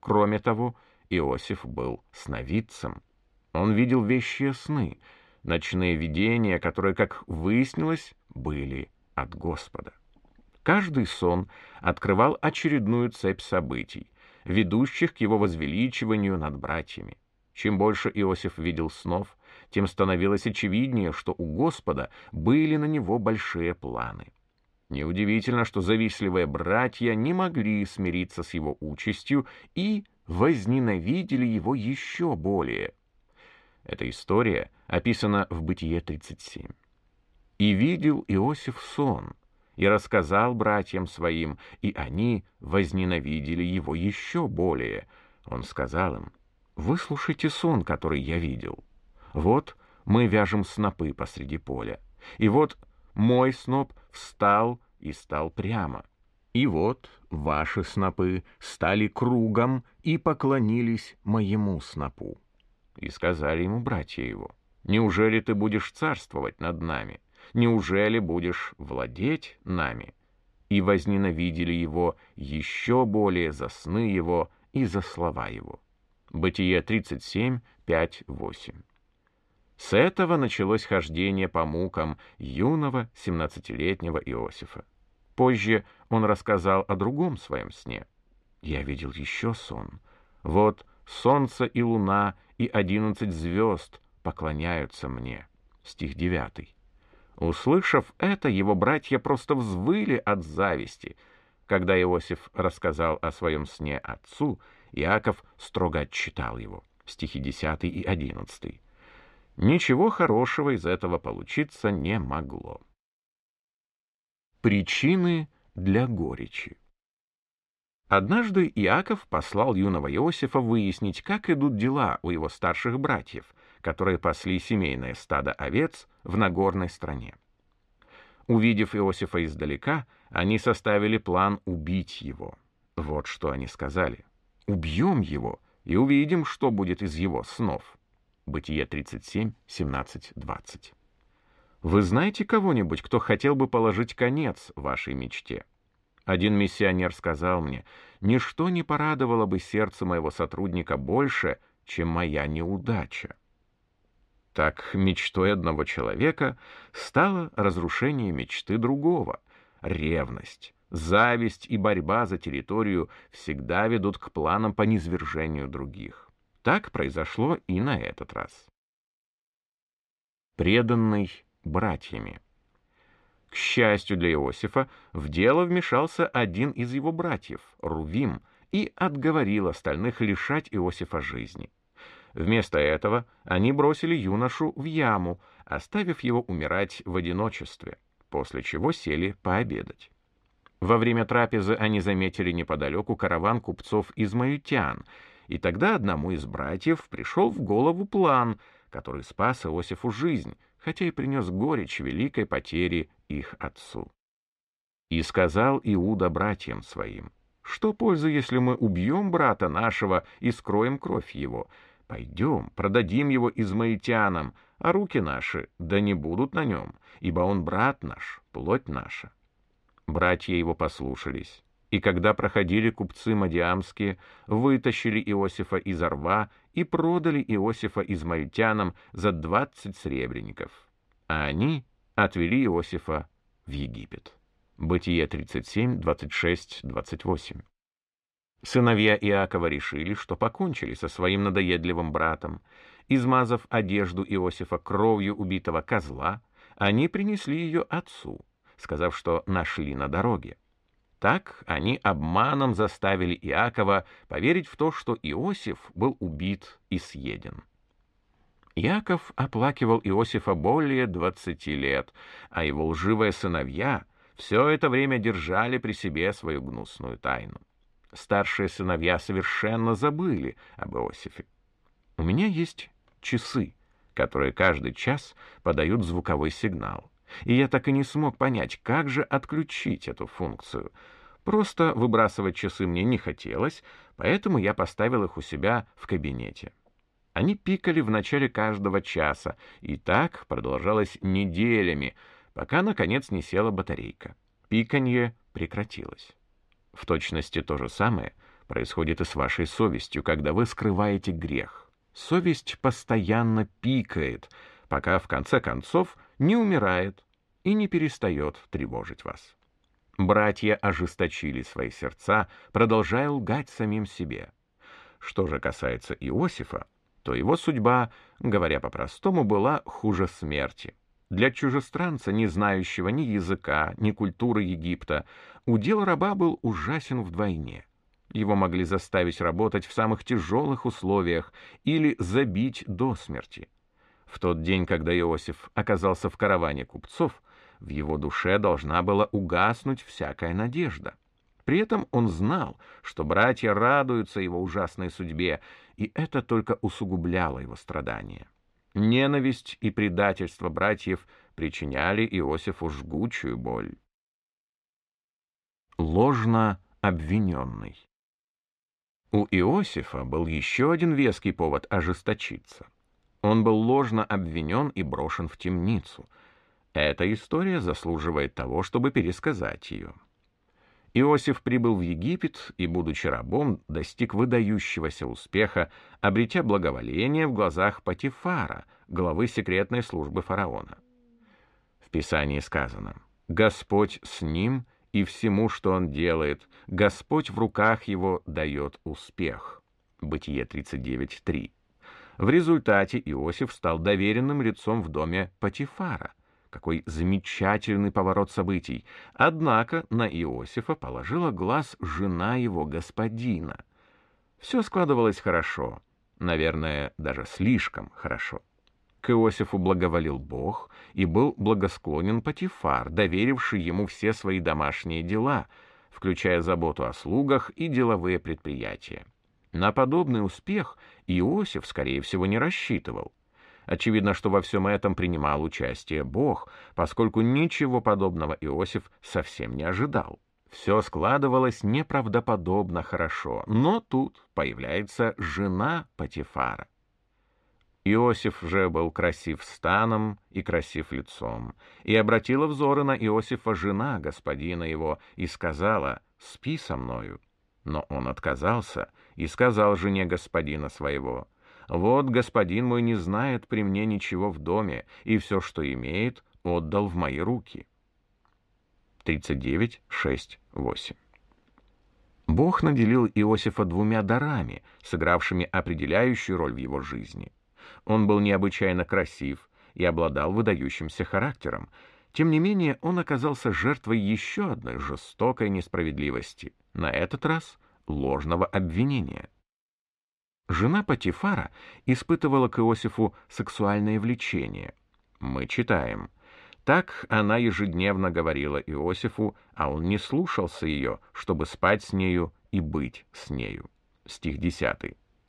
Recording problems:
muffled; slightly; fading above 3 kHz

